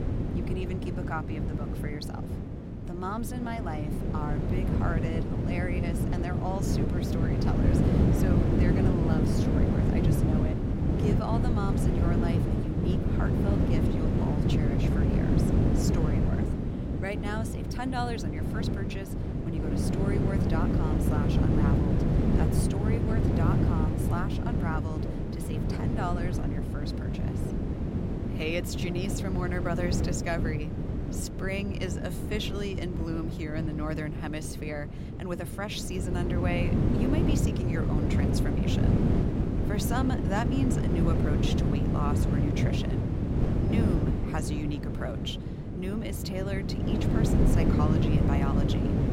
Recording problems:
wind noise on the microphone; heavy; 2 dB above the speech

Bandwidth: 16 kHz